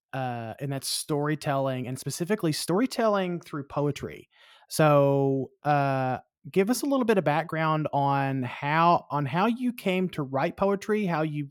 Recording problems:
uneven, jittery; strongly; from 1 to 11 s

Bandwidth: 17.5 kHz